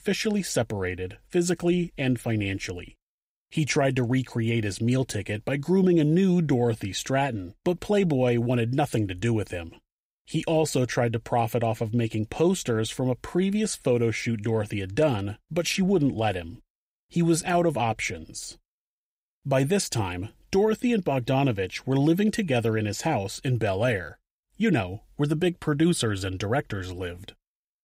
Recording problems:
none

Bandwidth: 15.5 kHz